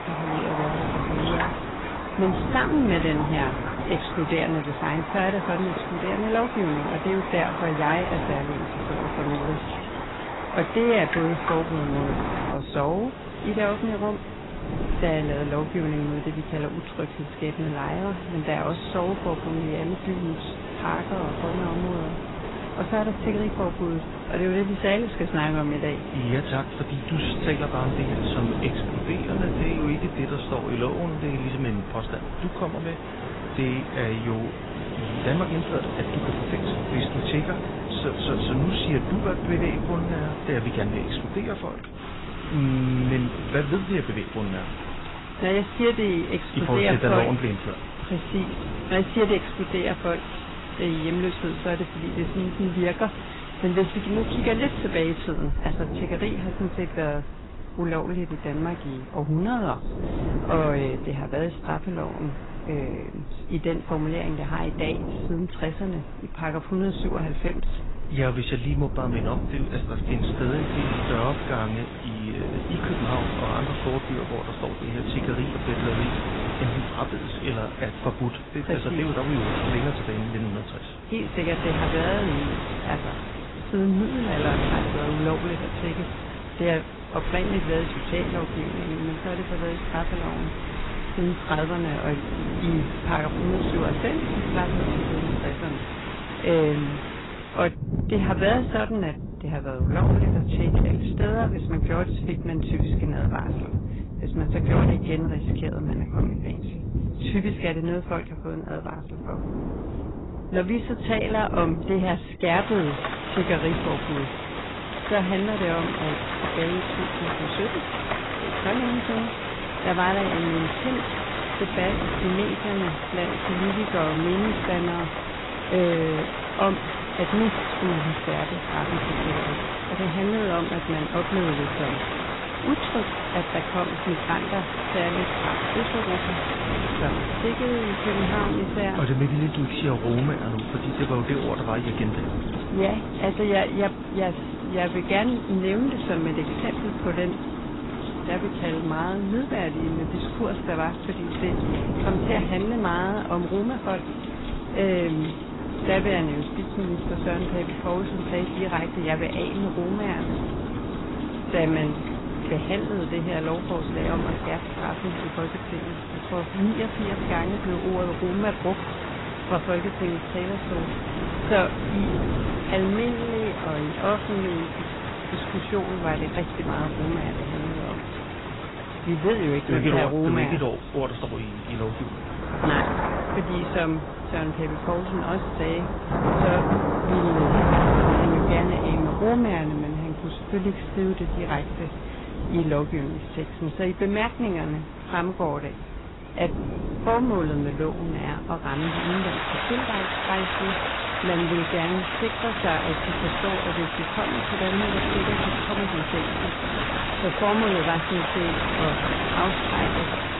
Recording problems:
garbled, watery; badly; nothing above 4 kHz
distortion; slight; 3% of the sound clipped
rain or running water; loud; throughout; 3 dB below the speech
wind noise on the microphone; occasional gusts; 15 dB below the speech

